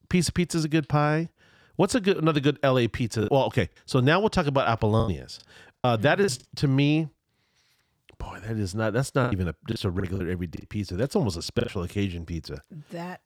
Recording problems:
choppy; very; from 3 to 6.5 s and from 9 to 12 s; 9% of the speech affected

